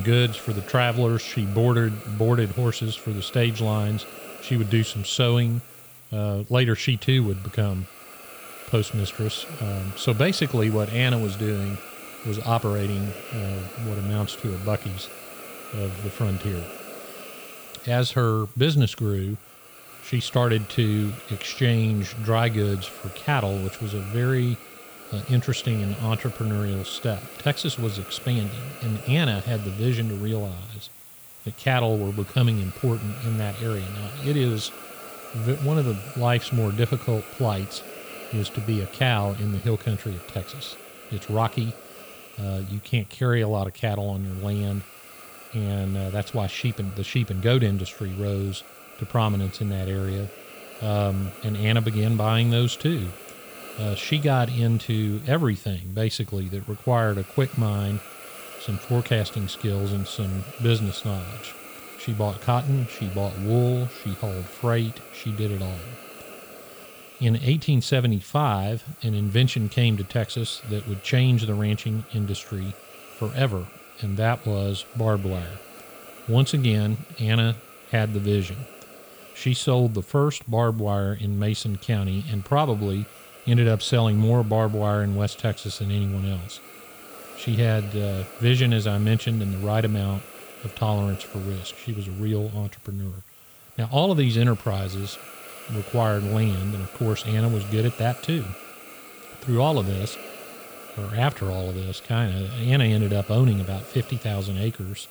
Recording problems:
hiss; noticeable; throughout; 15 dB below the speech
abrupt cut into speech; at the start

